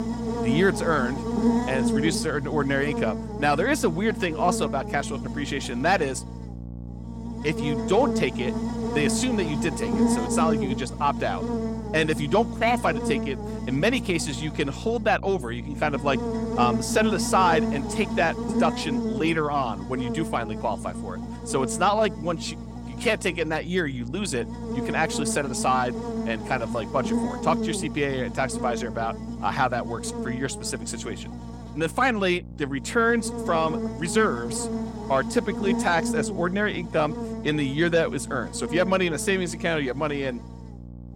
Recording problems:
electrical hum; loud; throughout; 60 Hz, 8 dB below the speech

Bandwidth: 16.5 kHz